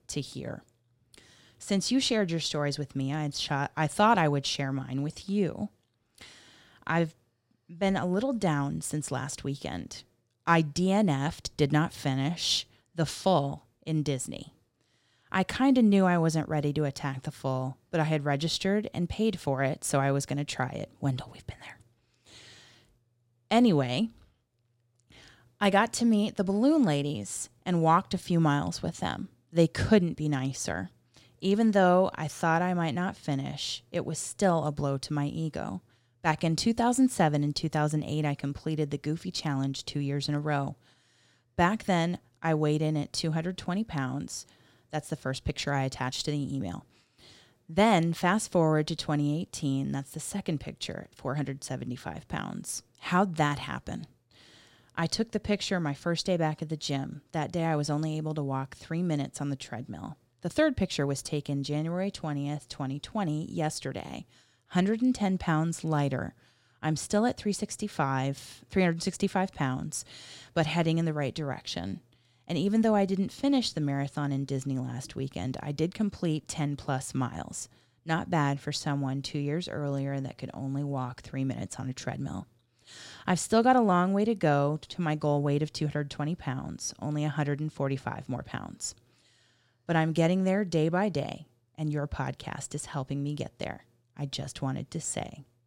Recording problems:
none

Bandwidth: 16 kHz